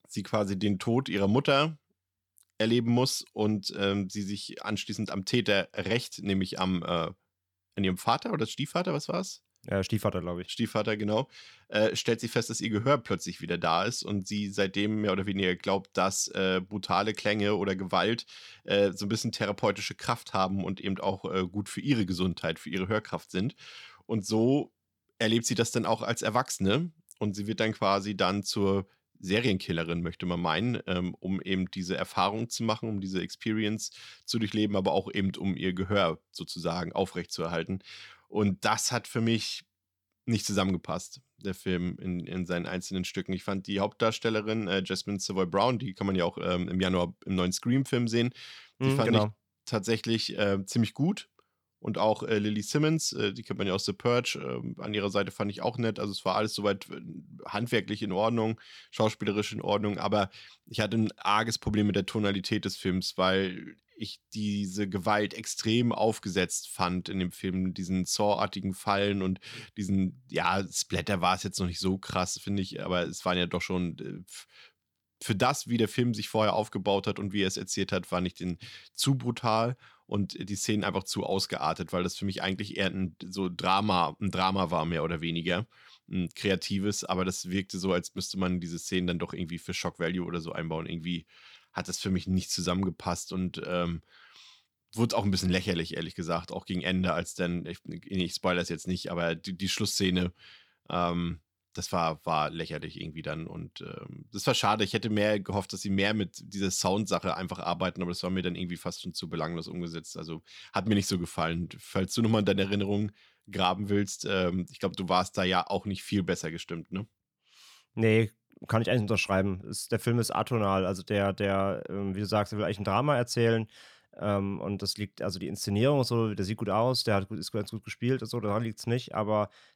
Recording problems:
none

